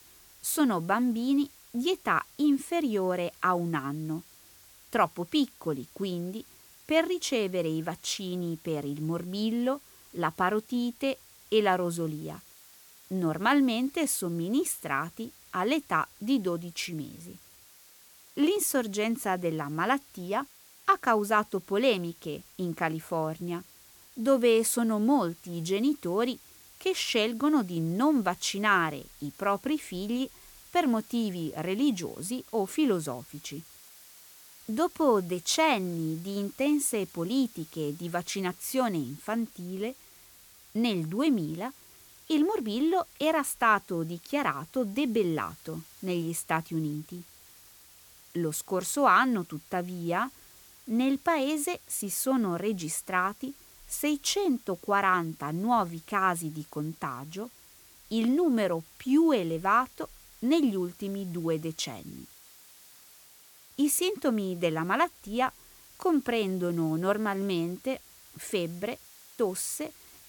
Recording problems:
hiss; faint; throughout; 20 dB below the speech

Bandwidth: 18.5 kHz